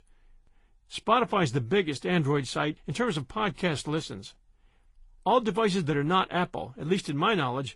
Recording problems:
garbled, watery; slightly

